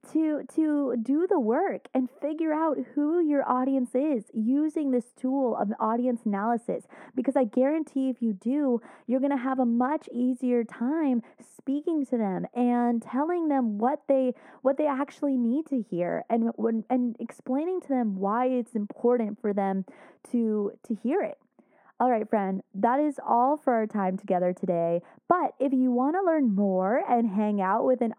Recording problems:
muffled; very; fading above 2 kHz

